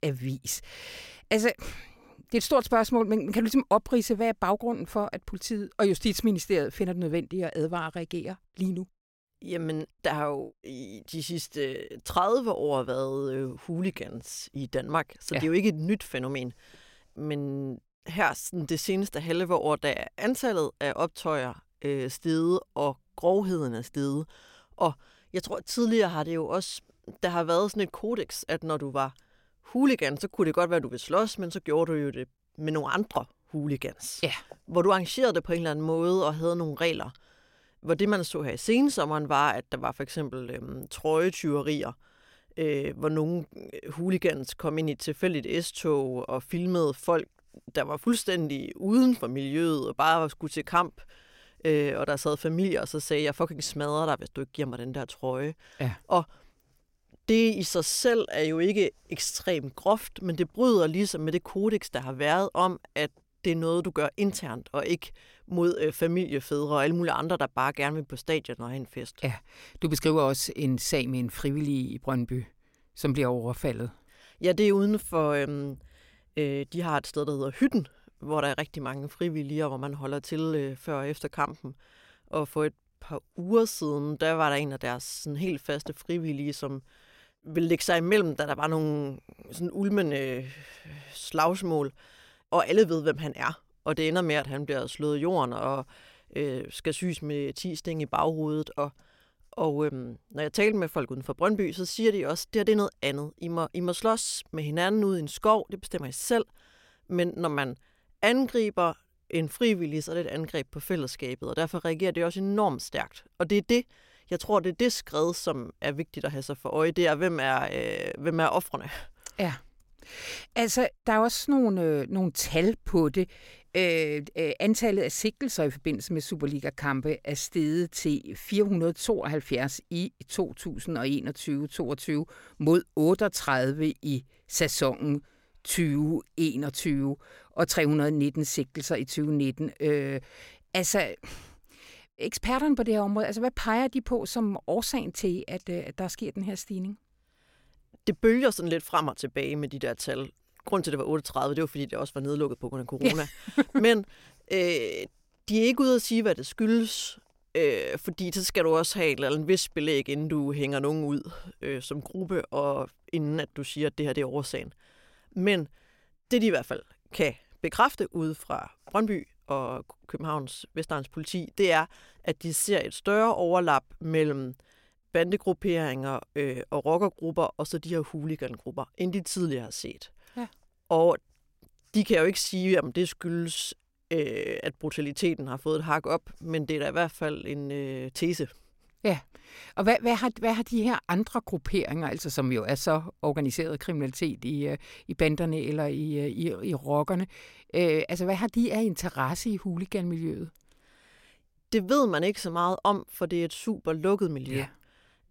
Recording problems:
none

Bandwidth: 16.5 kHz